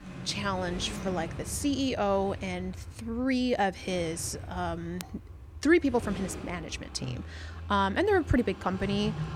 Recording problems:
traffic noise; noticeable; throughout; 10 dB below the speech

